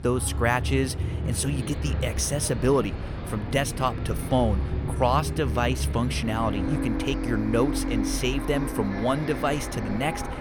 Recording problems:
traffic noise; loud; throughout; 3 dB below the speech

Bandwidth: 18 kHz